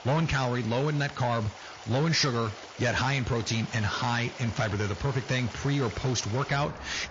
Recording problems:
distortion; slight; 9% of the sound clipped
garbled, watery; slightly; nothing above 6.5 kHz
rain or running water; noticeable; throughout; 15 dB below the speech

